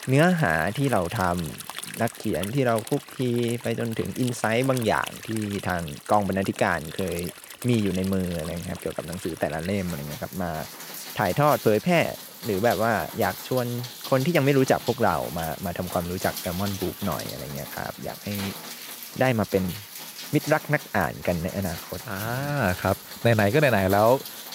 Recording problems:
rain or running water; noticeable; throughout; 10 dB below the speech

